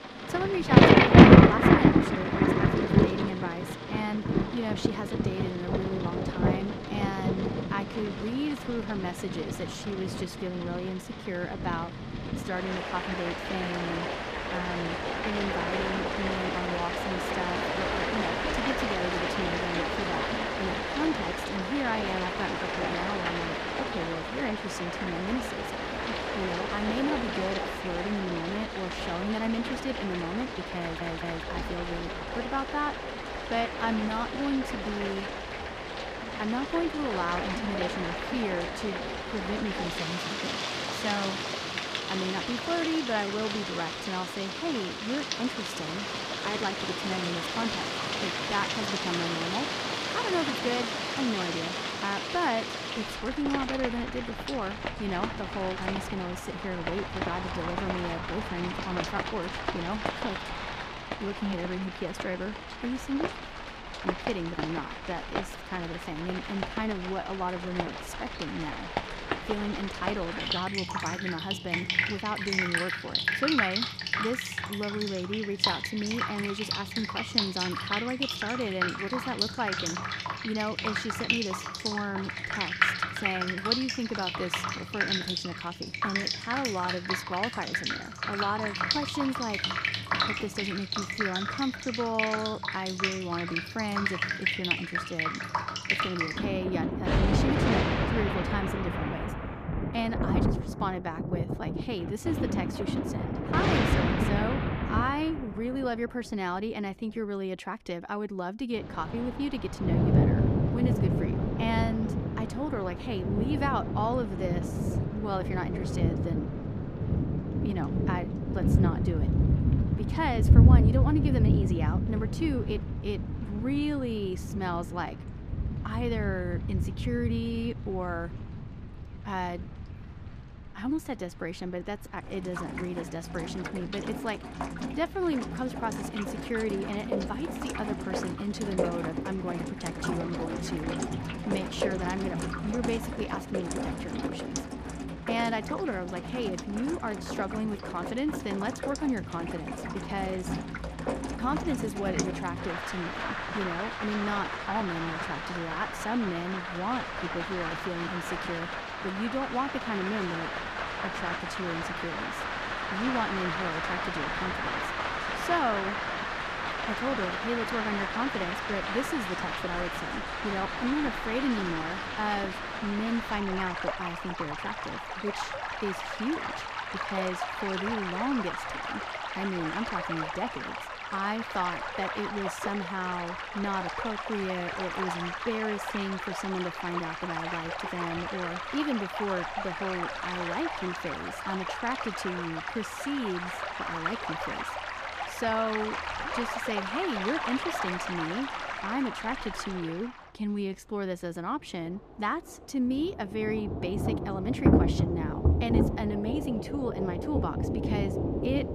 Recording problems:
rain or running water; very loud; throughout; 4 dB above the speech
audio stuttering; at 31 s

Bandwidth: 14.5 kHz